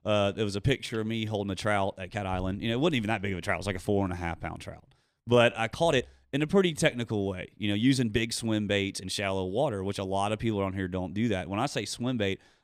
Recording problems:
uneven, jittery; strongly; from 0.5 to 9 s

